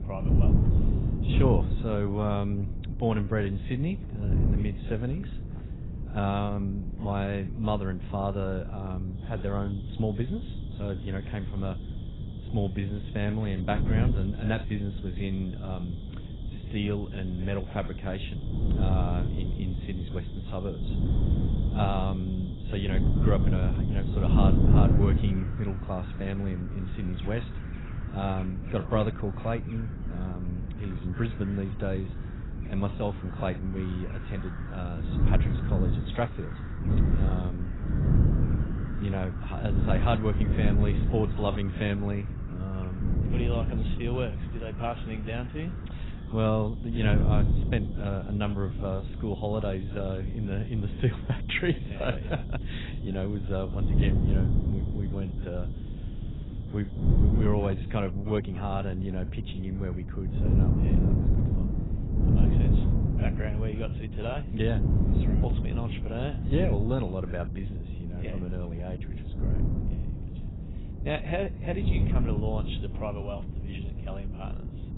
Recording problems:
garbled, watery; badly; nothing above 4 kHz
wind noise on the microphone; heavy; 6 dB below the speech
animal sounds; faint; until 58 s; 20 dB below the speech

